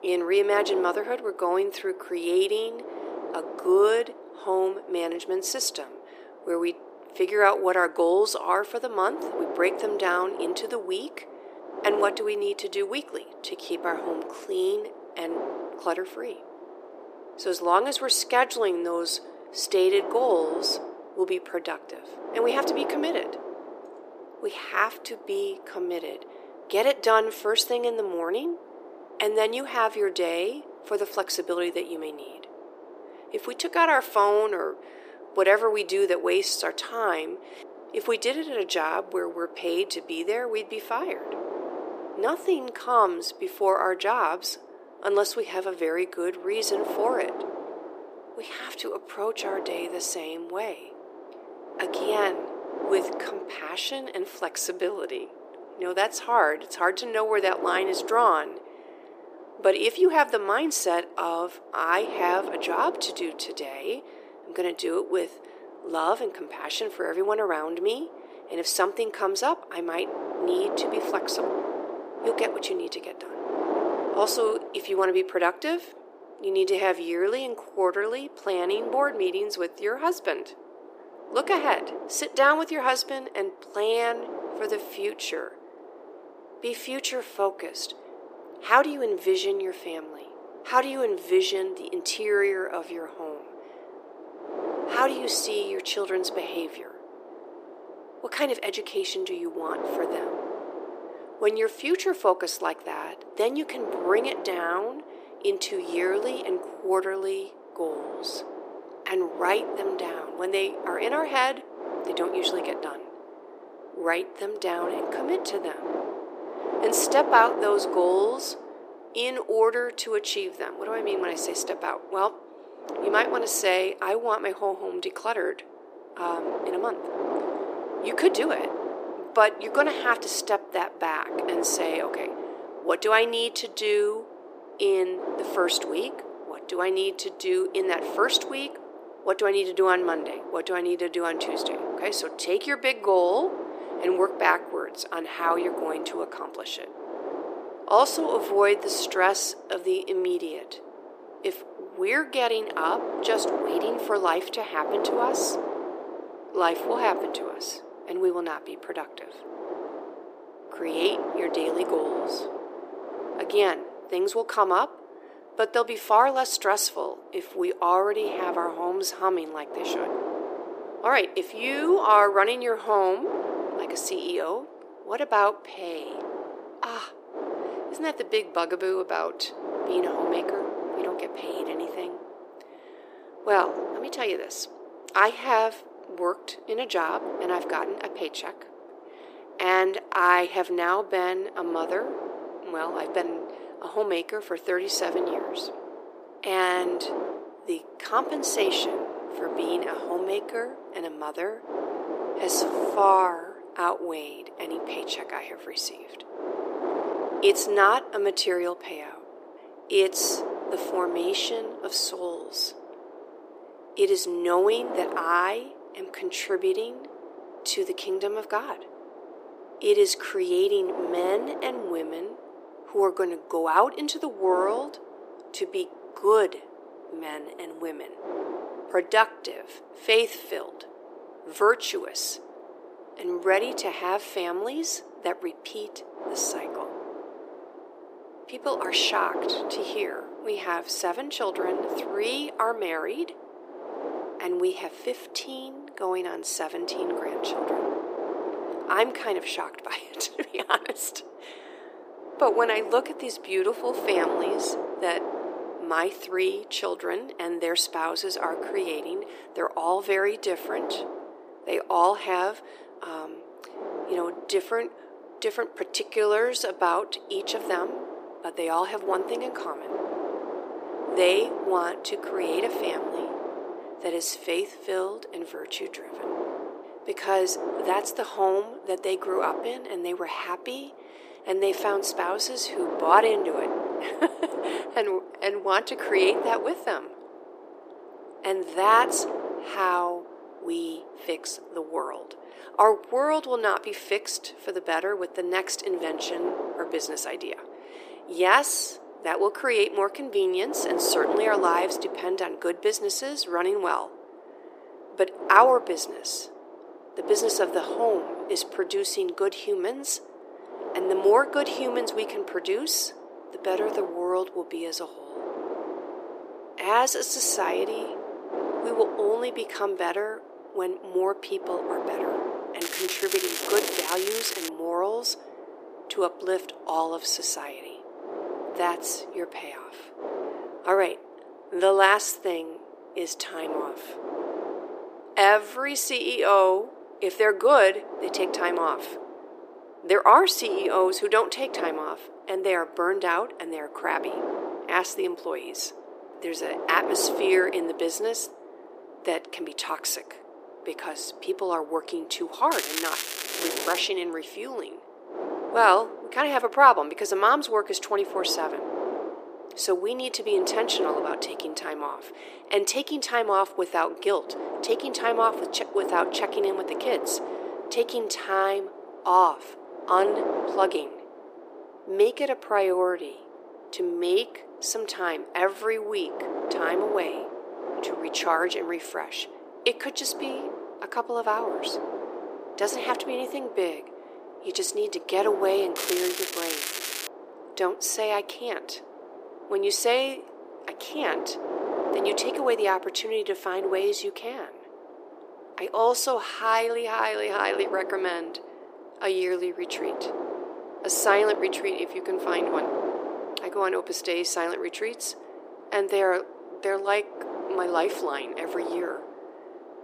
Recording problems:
thin; very; fading below 350 Hz
crackling; loud; from 5:23 to 5:25, from 5:53 to 5:54 and from 6:26 to 6:27; 4 dB below the speech
wind noise on the microphone; occasional gusts; 10 dB below the speech

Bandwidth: 15 kHz